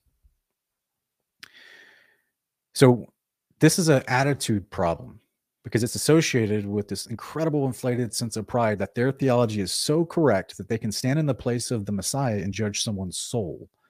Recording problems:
uneven, jittery; strongly; from 2.5 to 13 s

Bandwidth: 15 kHz